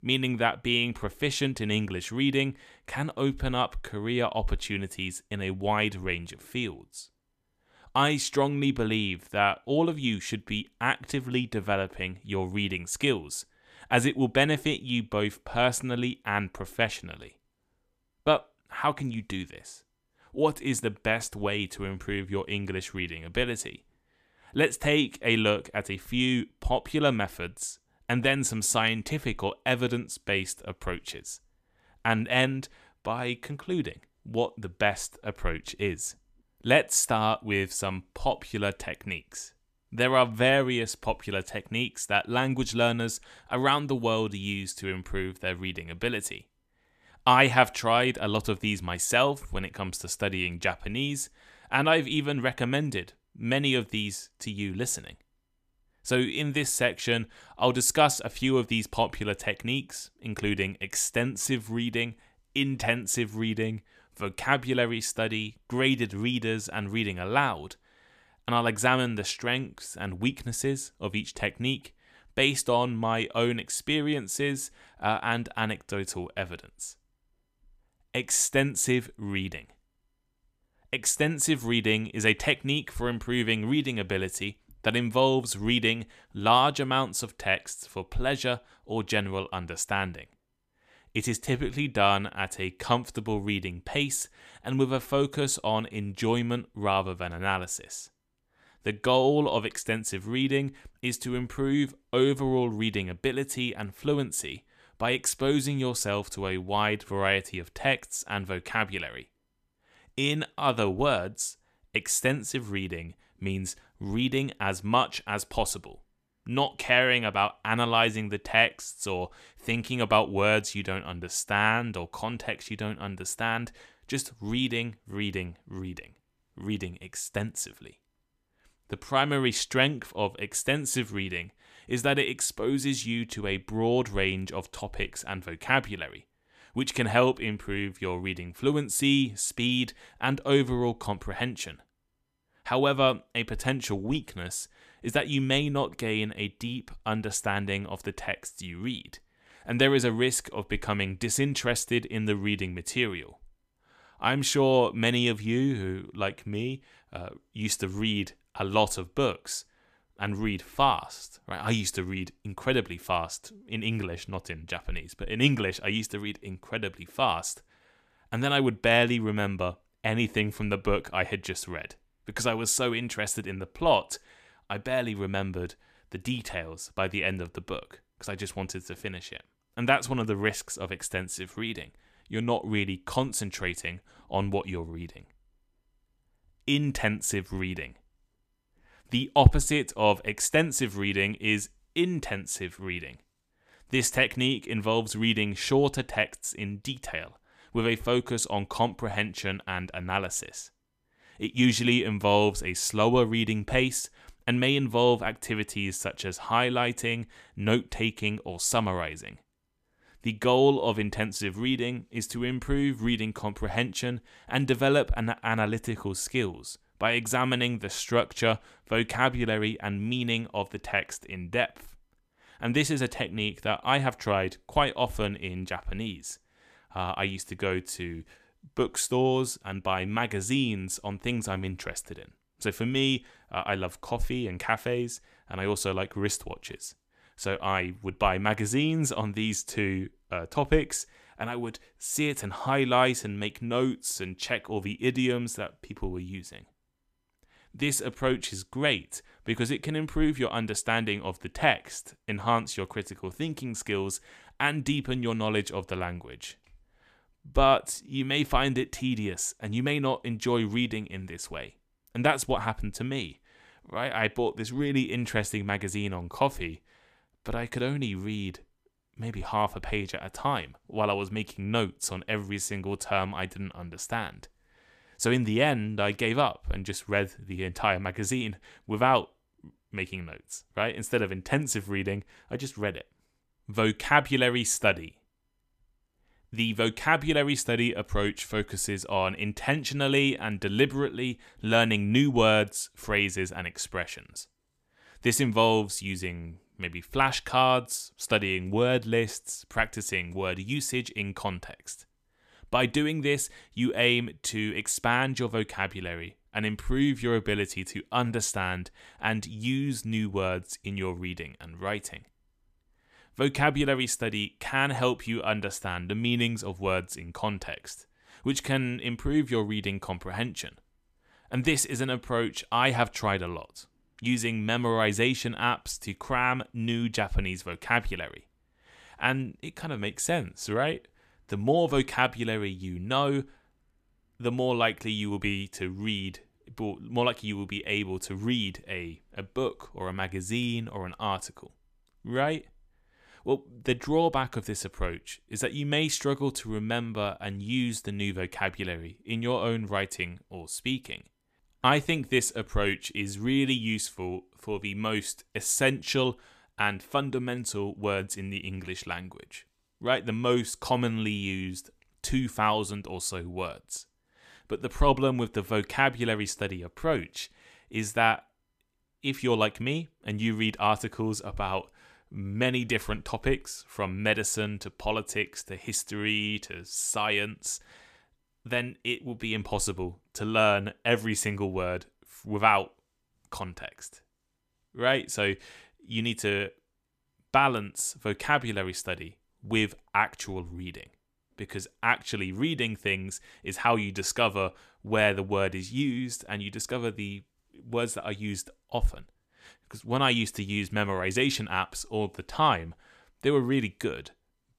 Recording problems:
none

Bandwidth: 14.5 kHz